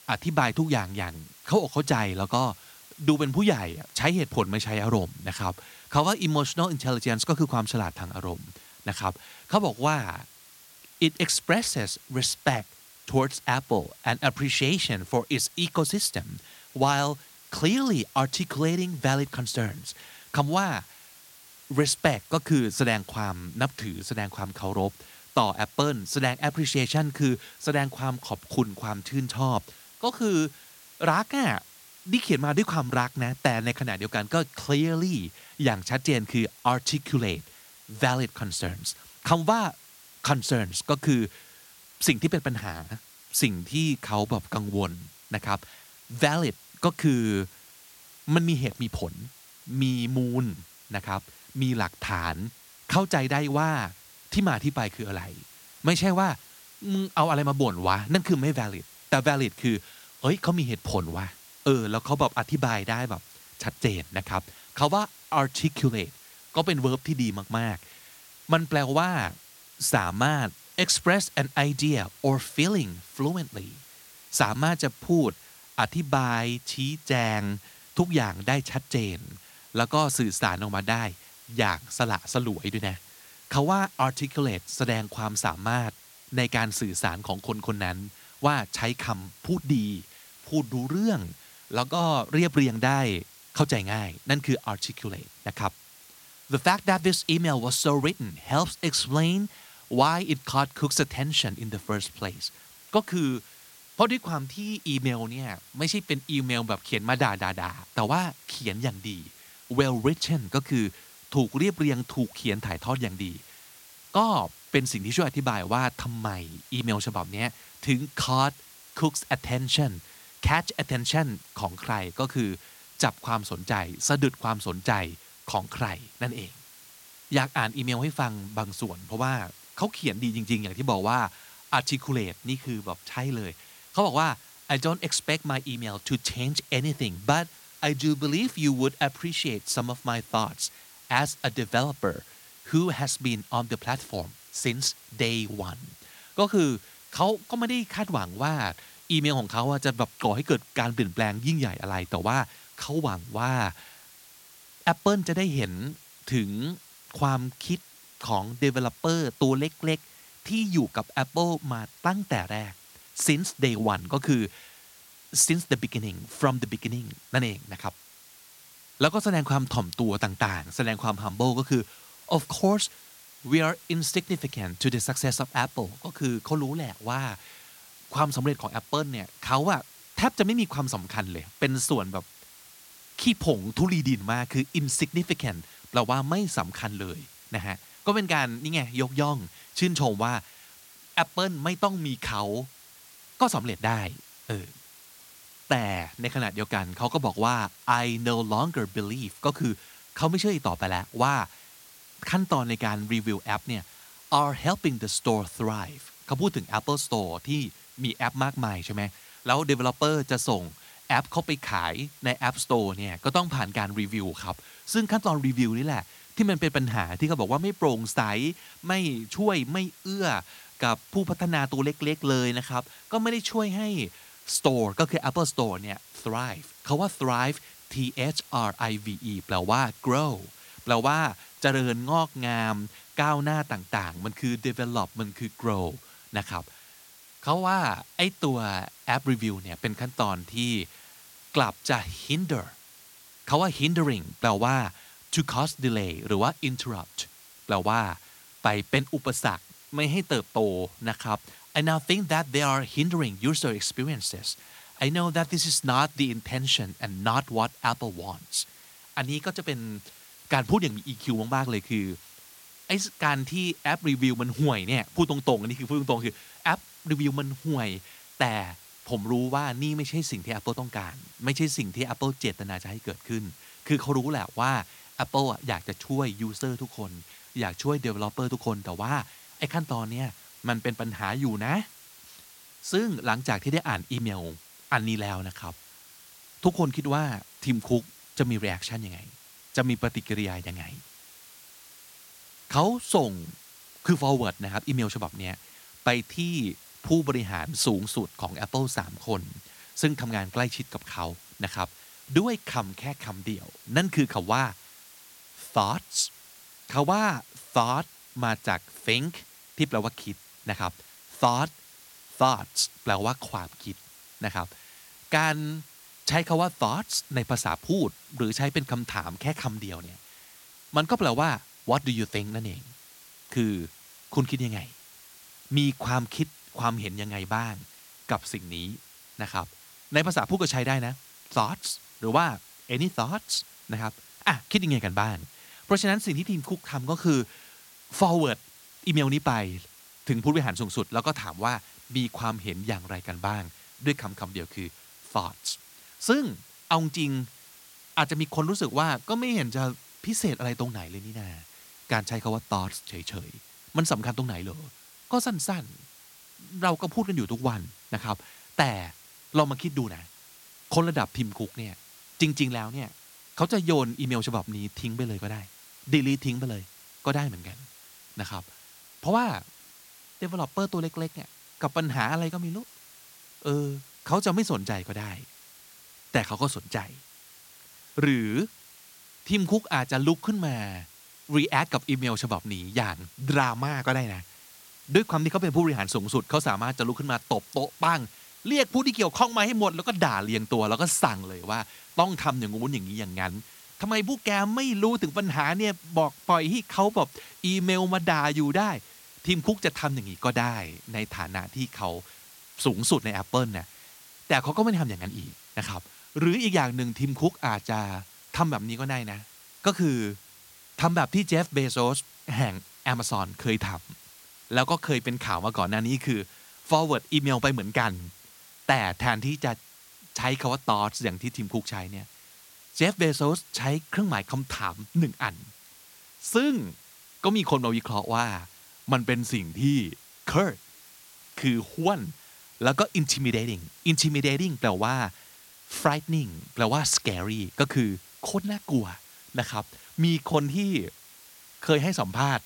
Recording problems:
hiss; faint; throughout; 20 dB below the speech

